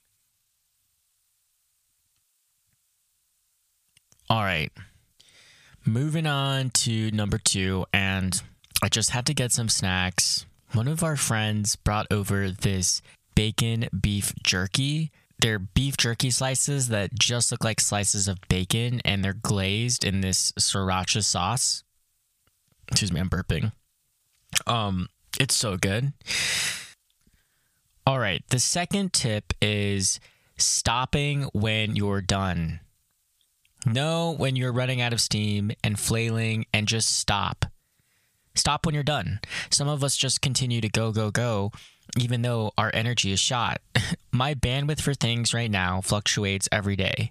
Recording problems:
squashed, flat; somewhat

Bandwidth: 14.5 kHz